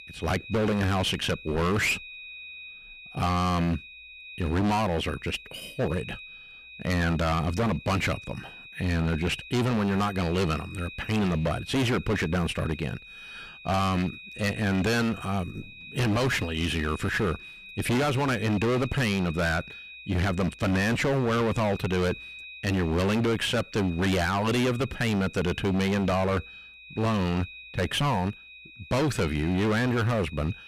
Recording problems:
distortion; heavy; 25% of the sound clipped
high-pitched whine; noticeable; throughout; 2.5 kHz, 15 dB below the speech

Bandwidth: 14.5 kHz